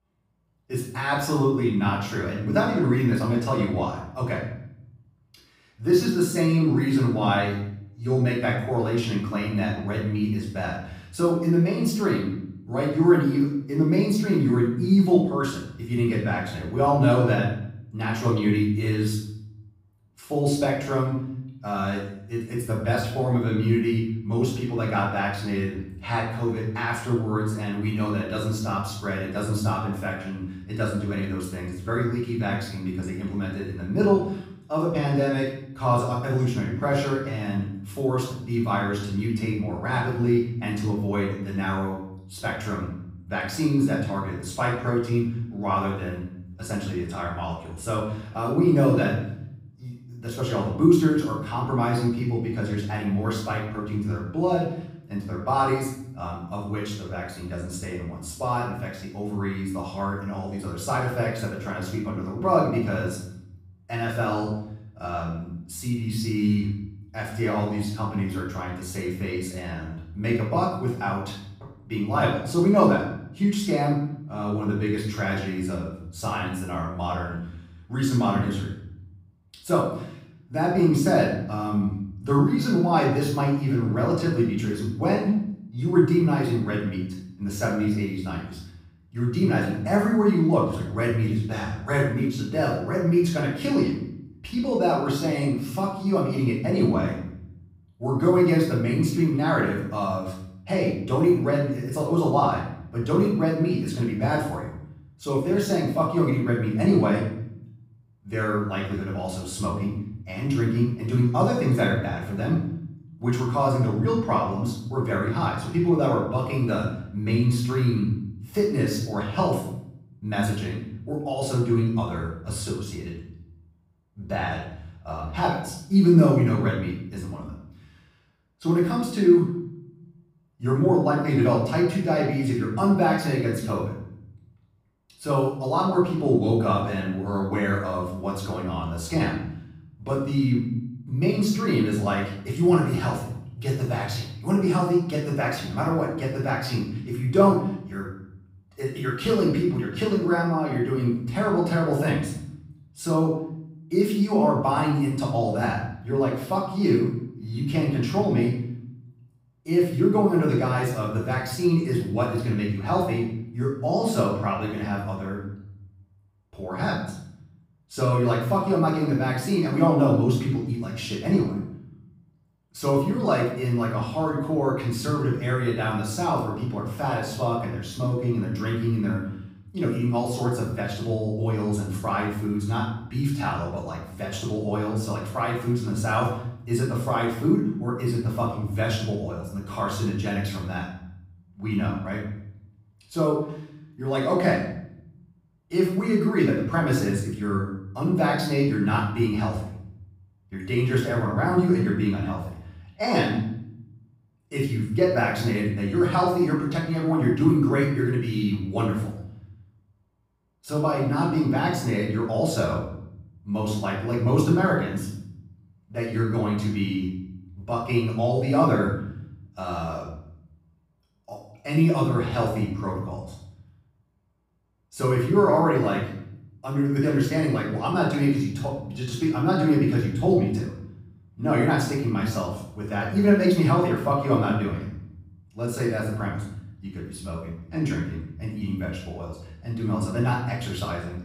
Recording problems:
off-mic speech; far
room echo; noticeable; dies away in 0.7 s

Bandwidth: 15.5 kHz